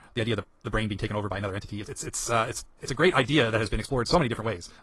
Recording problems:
wrong speed, natural pitch; too fast; 1.7 times normal speed
garbled, watery; slightly; nothing above 11.5 kHz

